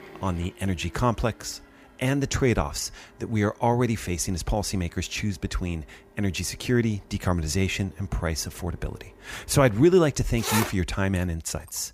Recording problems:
household noises; loud; throughout; 8 dB below the speech

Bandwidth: 15 kHz